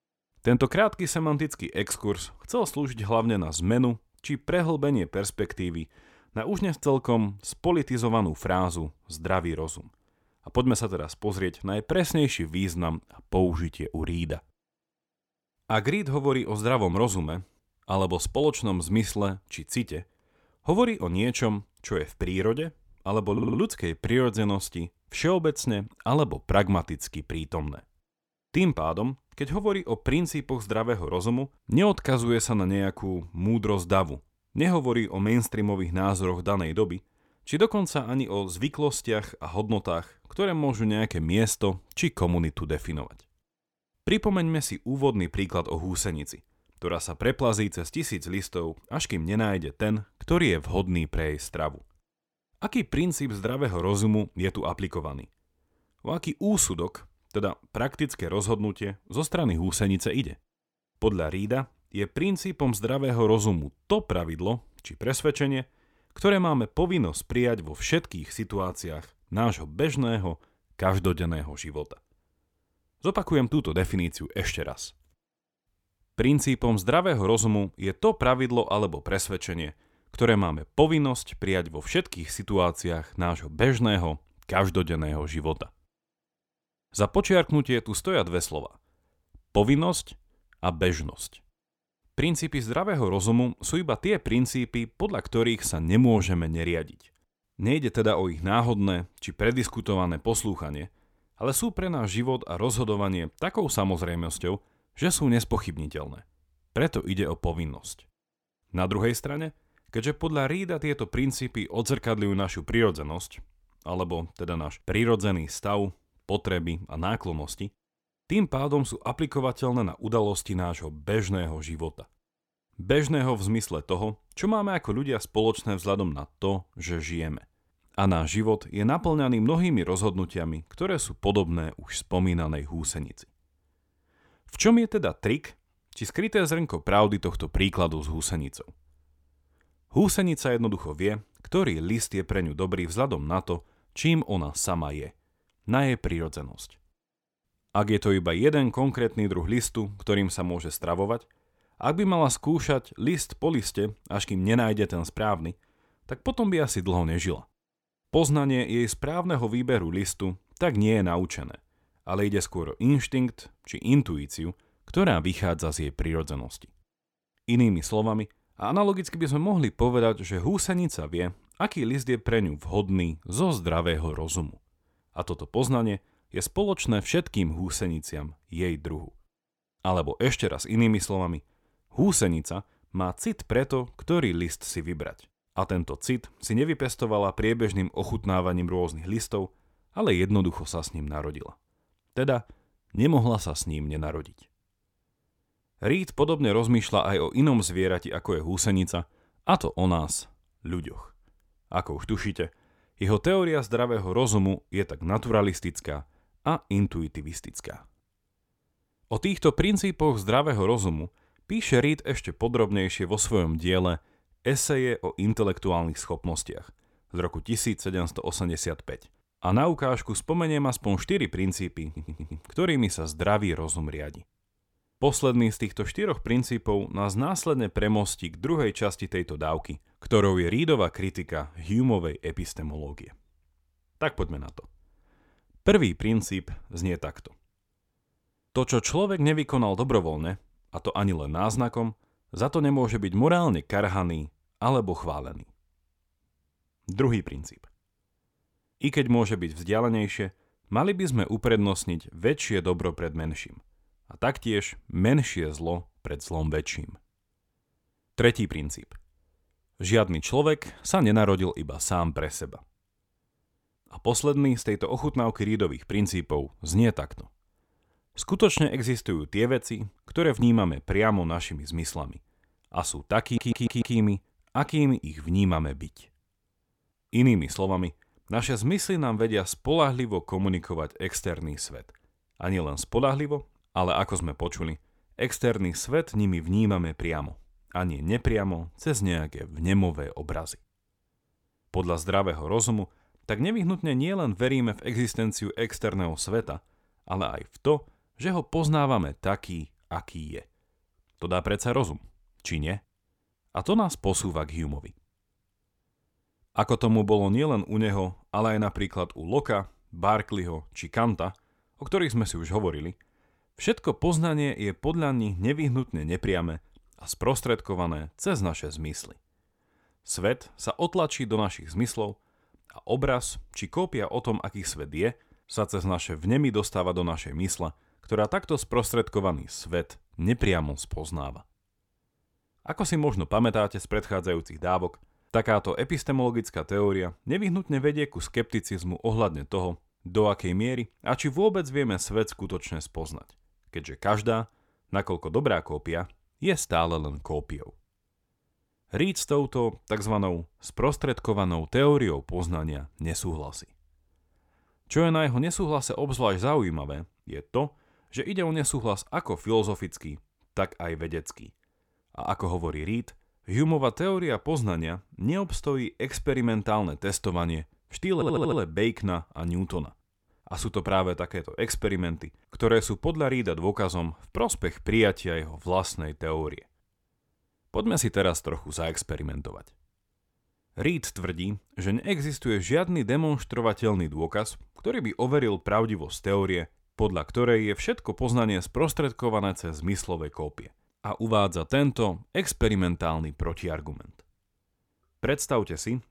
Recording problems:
audio stuttering; 4 times, first at 23 s

